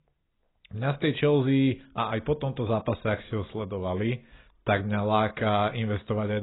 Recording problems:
garbled, watery; badly; nothing above 4 kHz
abrupt cut into speech; at the end

